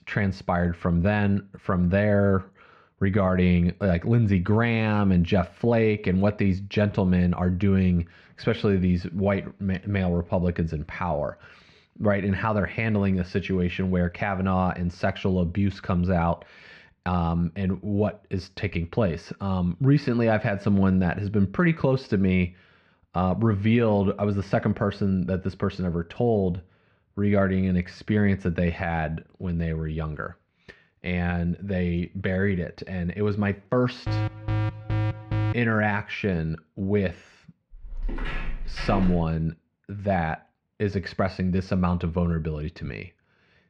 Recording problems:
muffled; slightly; fading above 2.5 kHz
alarm; noticeable; from 34 to 36 s; peak 3 dB below the speech
footsteps; noticeable; from 38 to 39 s; peak 7 dB below the speech

